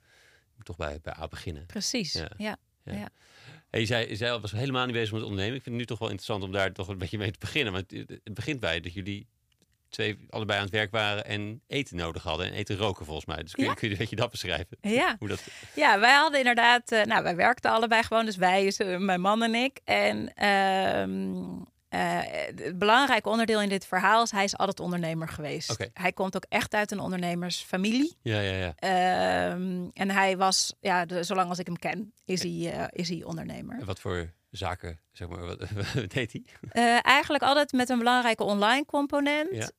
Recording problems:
none

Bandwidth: 15 kHz